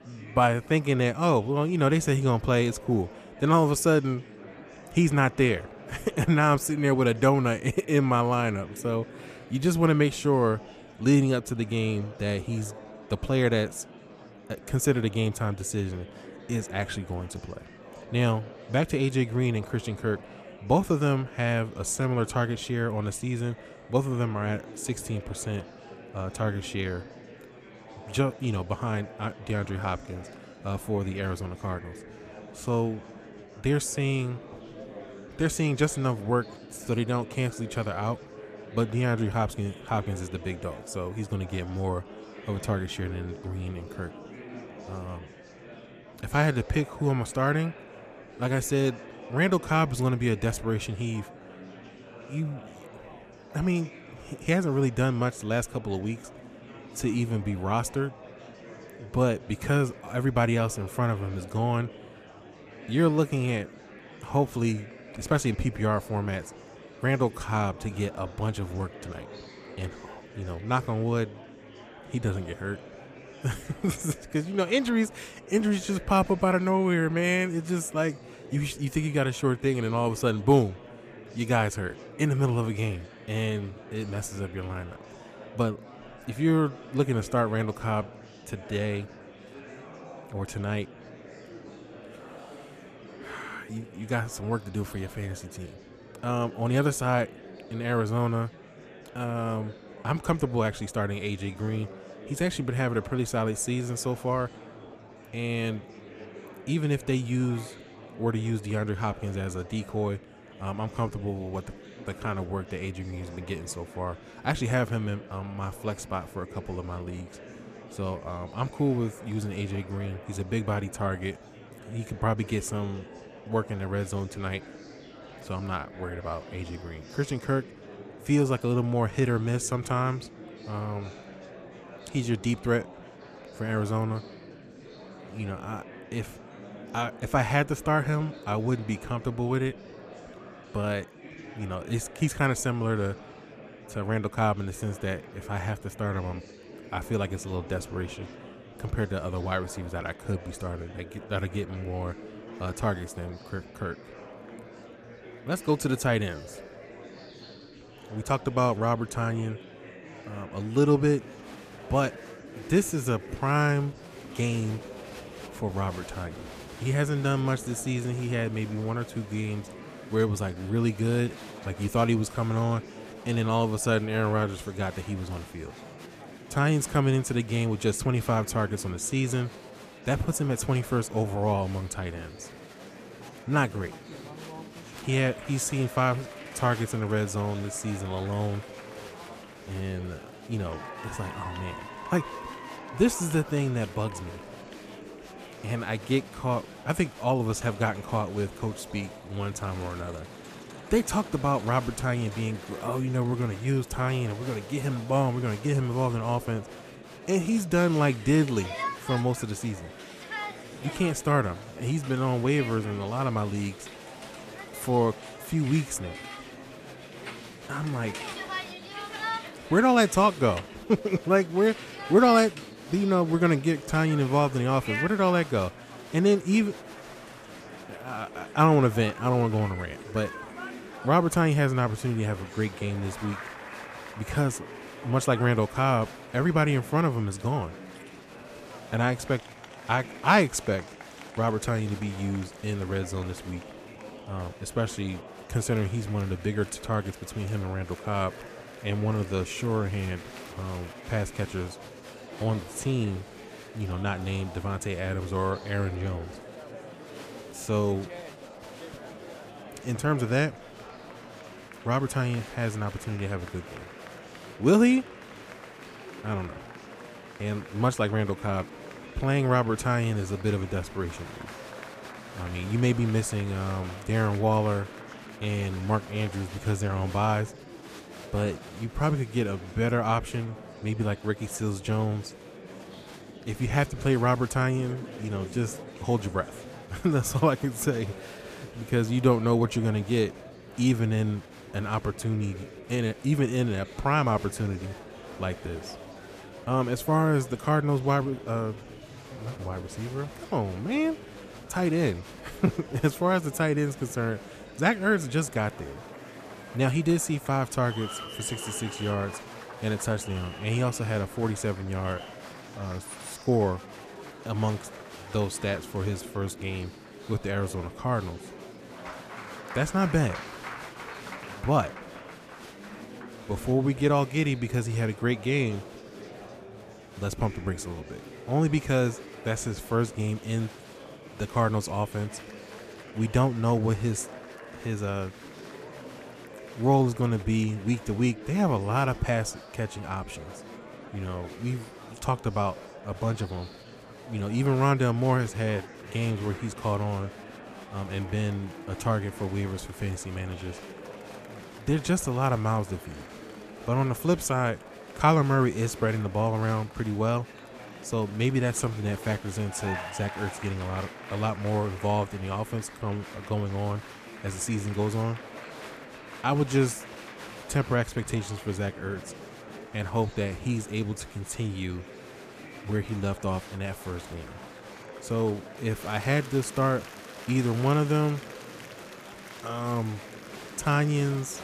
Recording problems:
murmuring crowd; noticeable; throughout; 15 dB below the speech

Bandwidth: 14.5 kHz